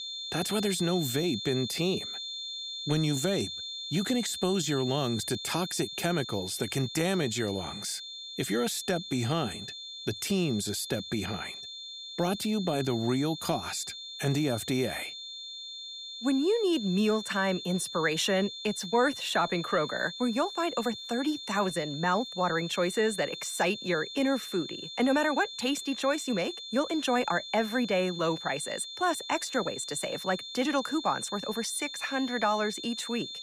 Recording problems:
high-pitched whine; loud; throughout; 3.5 kHz, 8 dB below the speech

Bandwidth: 15.5 kHz